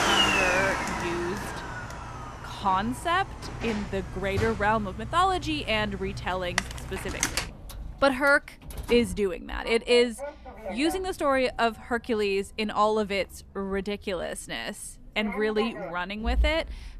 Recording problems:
household noises; loud; throughout; 5 dB below the speech

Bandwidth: 14 kHz